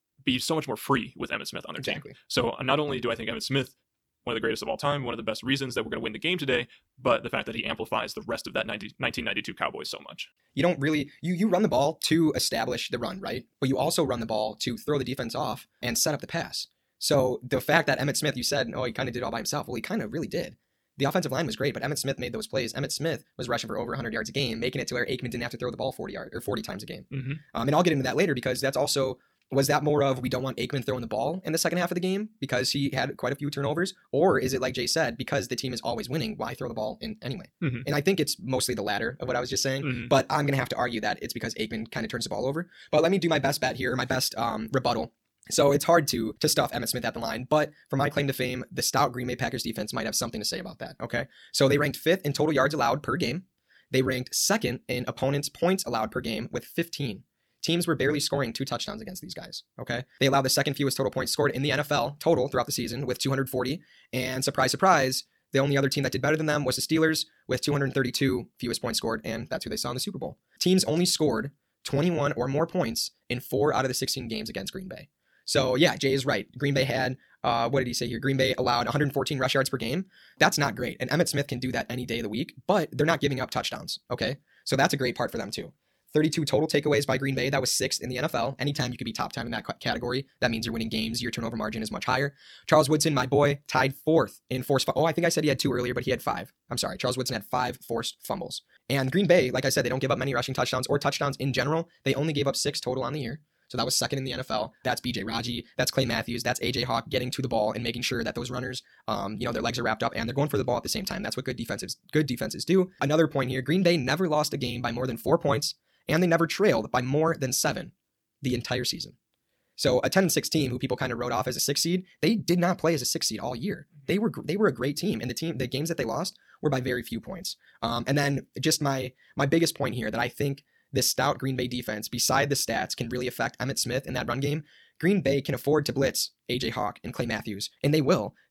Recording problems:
wrong speed, natural pitch; too fast; 1.5 times normal speed

